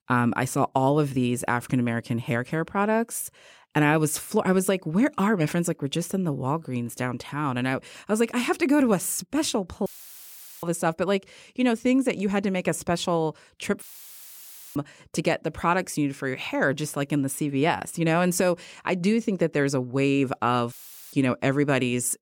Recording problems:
audio cutting out; filled with static; at 10 s for 1 s, at 14 s for 1 s and at 21 s

